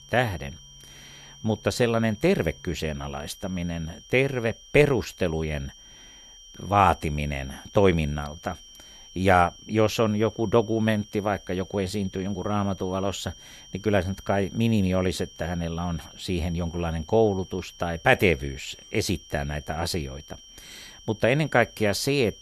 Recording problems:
high-pitched whine; faint; throughout; 3 kHz, 20 dB below the speech

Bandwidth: 13.5 kHz